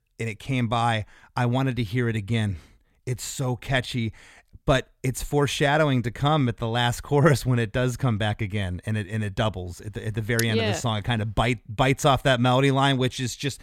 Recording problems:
none

